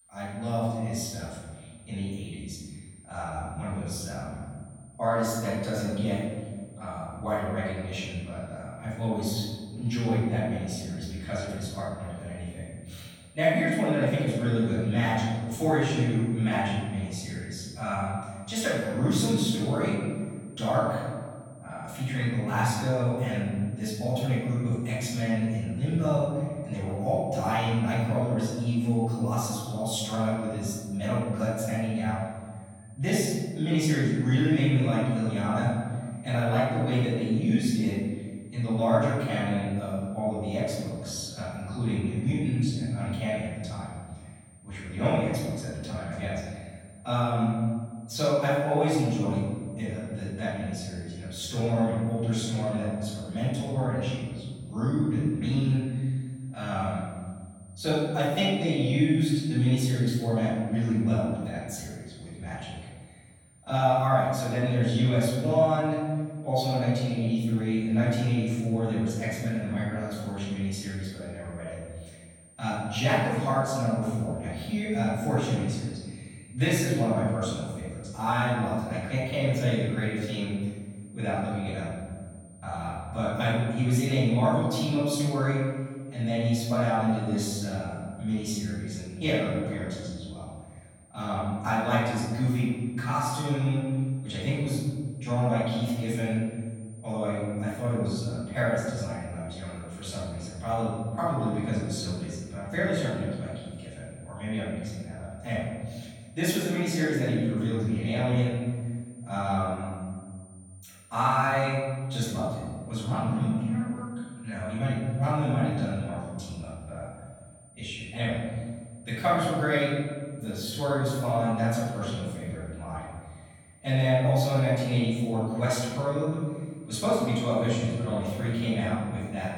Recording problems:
room echo; strong; dies away in 1.6 s
off-mic speech; far
high-pitched whine; faint; throughout; 9 kHz, 25 dB below the speech

